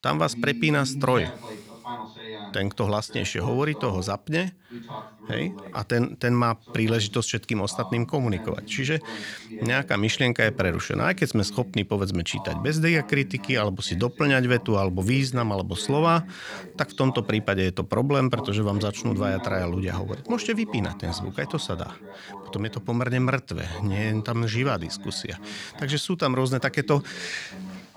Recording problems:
voice in the background; noticeable; throughout; 15 dB below the speech

